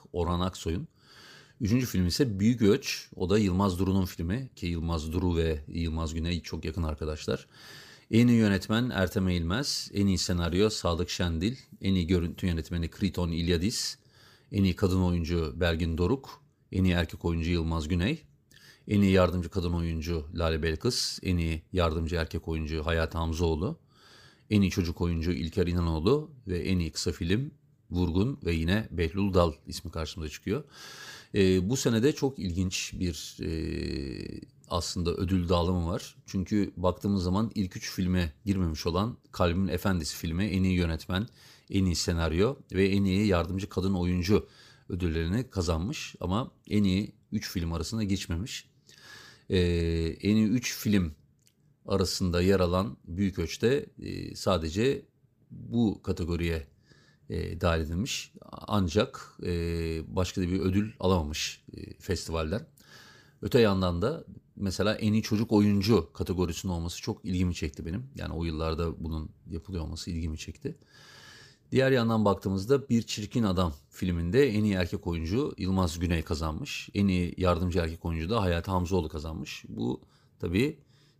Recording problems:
none

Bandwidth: 15 kHz